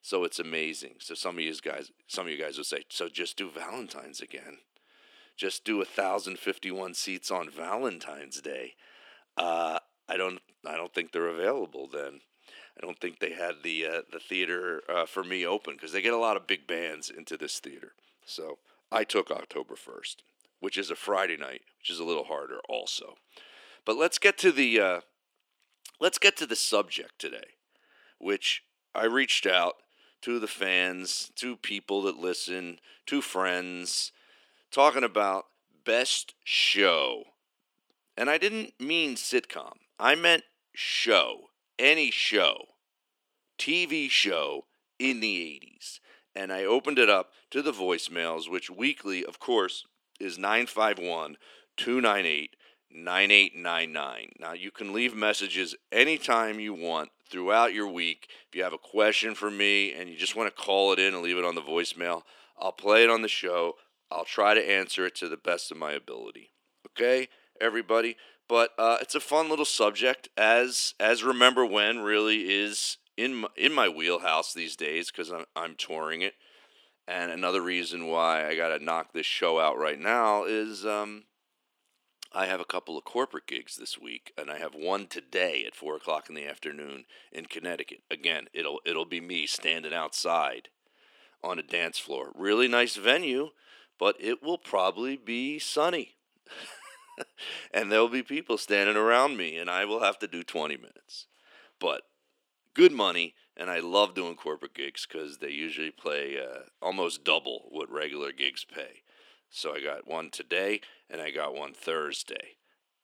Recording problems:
thin; somewhat; fading below 300 Hz

